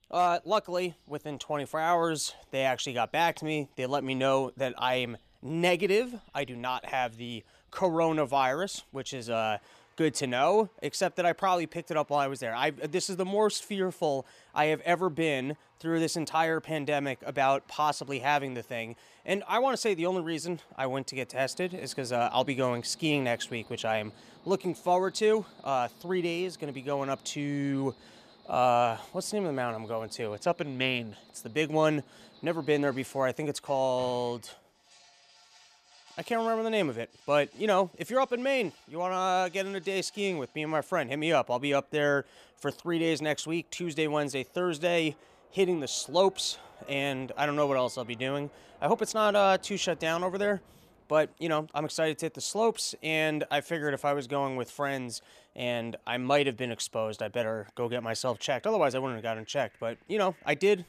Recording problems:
animal sounds; faint; throughout; 30 dB below the speech

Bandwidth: 14.5 kHz